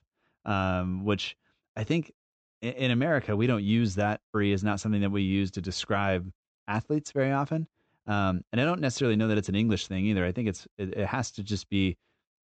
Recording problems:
high frequencies cut off; noticeable; nothing above 8 kHz

